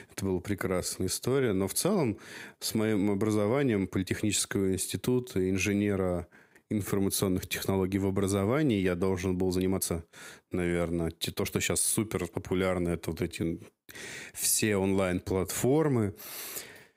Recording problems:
squashed, flat; somewhat
uneven, jittery; strongly; from 0.5 to 16 s

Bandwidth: 15.5 kHz